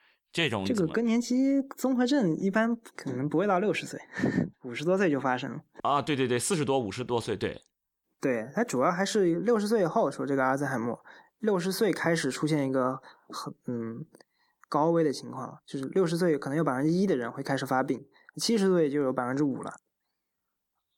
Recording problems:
none

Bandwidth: 18.5 kHz